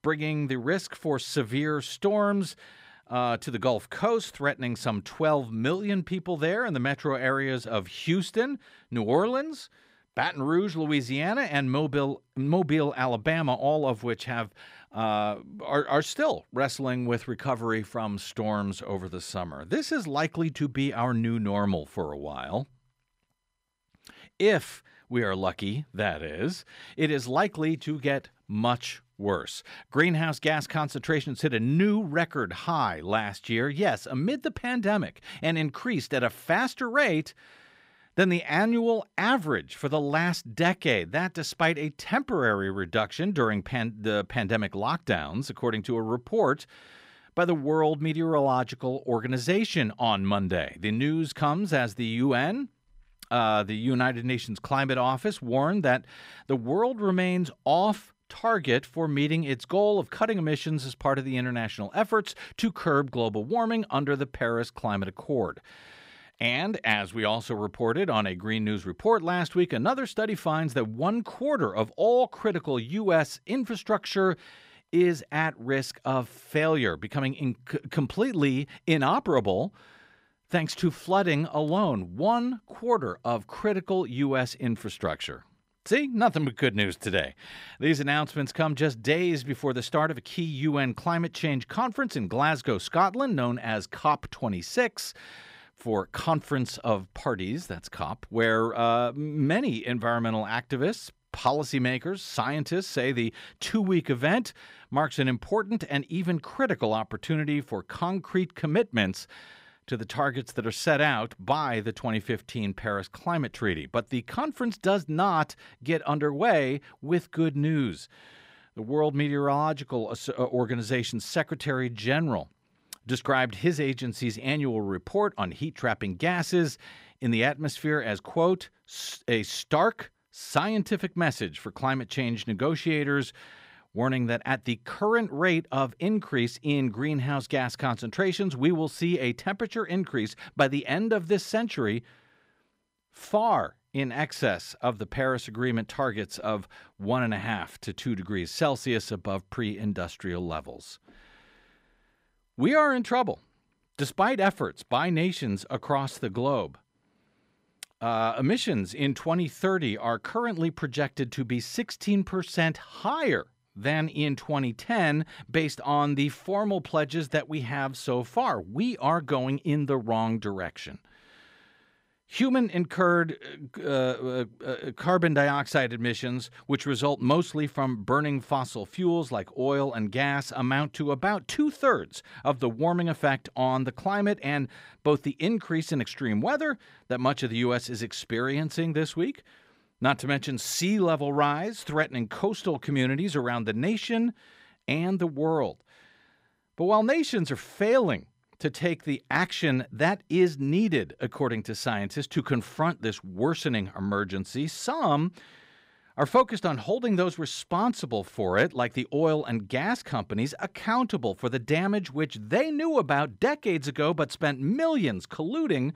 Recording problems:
none

